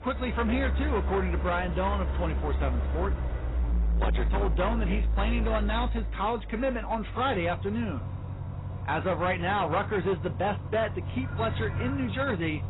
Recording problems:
garbled, watery; badly; nothing above 4 kHz
distortion; slight; 14% of the sound clipped
traffic noise; loud; throughout; 2 dB below the speech

